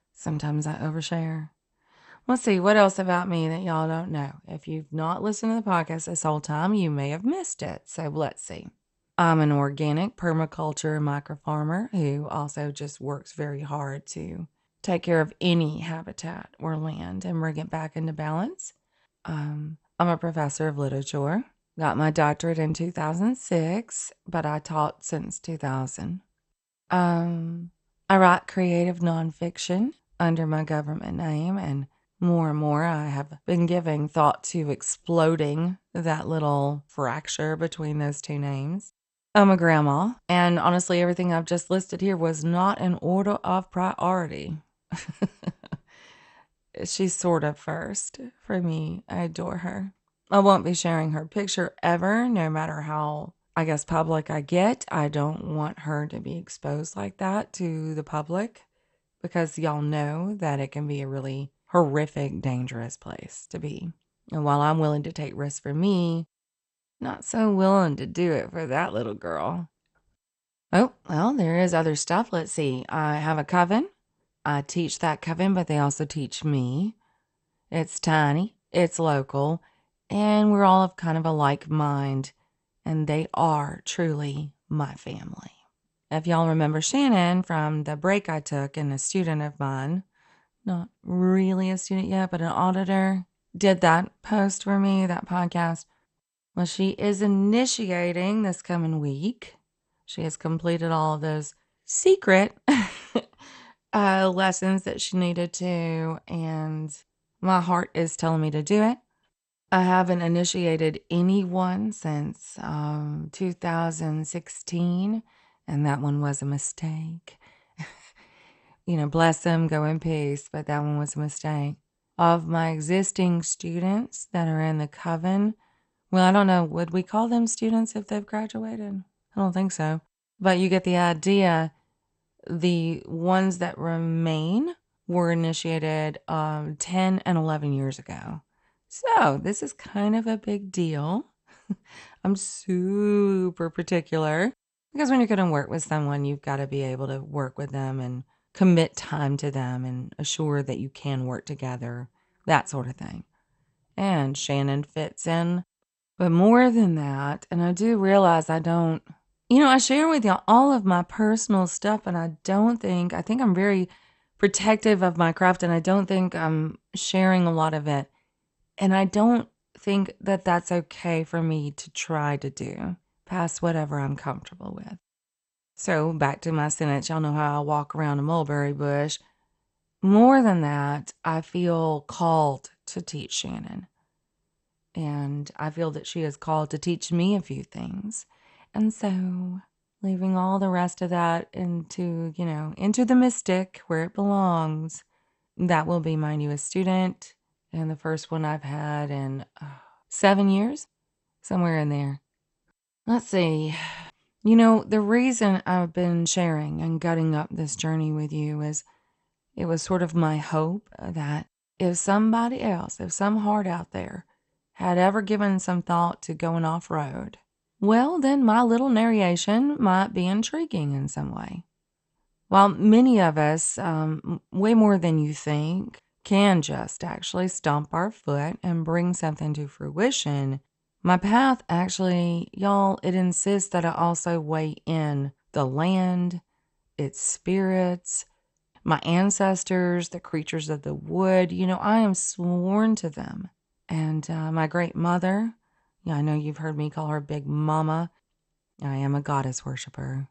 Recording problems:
garbled, watery; slightly; nothing above 8.5 kHz

